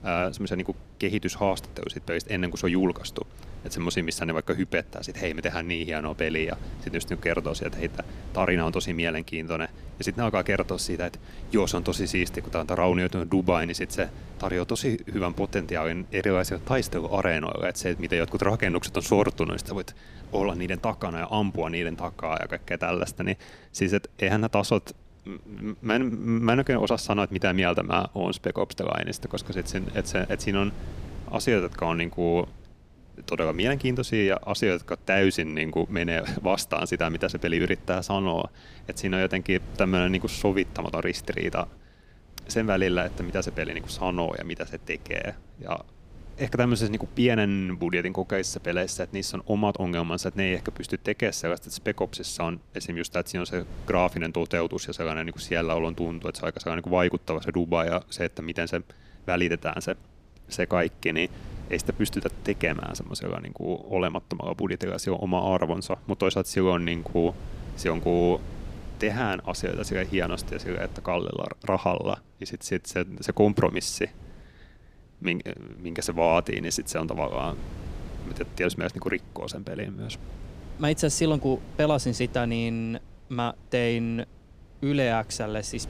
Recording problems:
wind noise on the microphone; occasional gusts; 25 dB below the speech

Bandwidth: 15 kHz